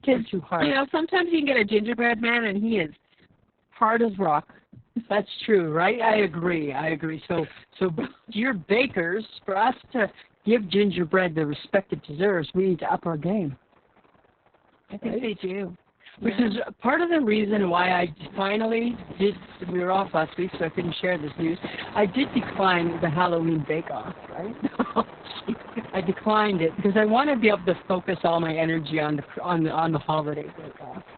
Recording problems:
garbled, watery; badly; nothing above 4 kHz
train or aircraft noise; noticeable; throughout; 20 dB below the speech

